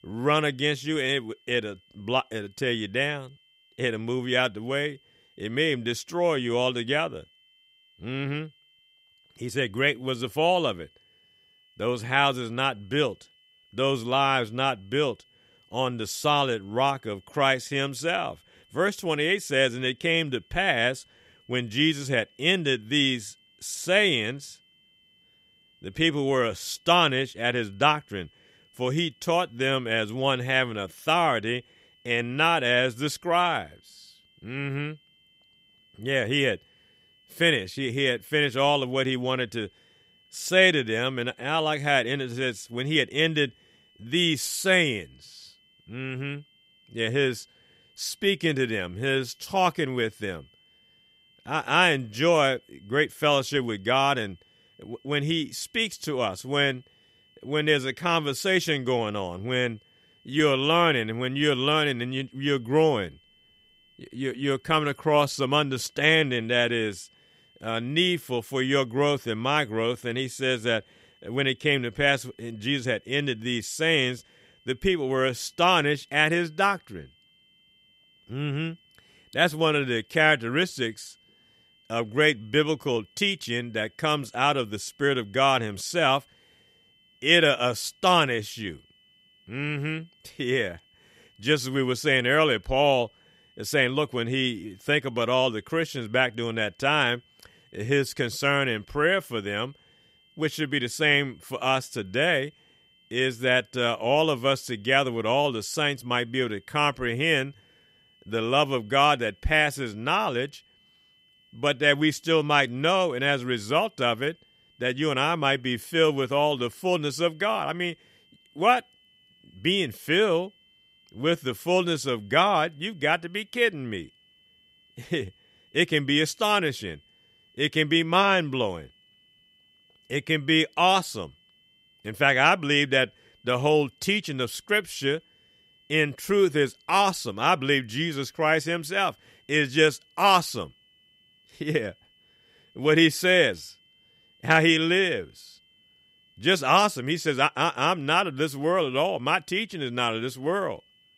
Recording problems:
high-pitched whine; faint; throughout; 3 kHz, 35 dB below the speech

